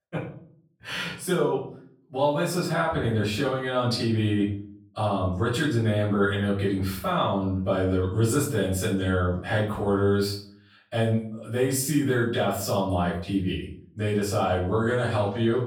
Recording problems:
off-mic speech; far
room echo; noticeable; dies away in 0.5 s

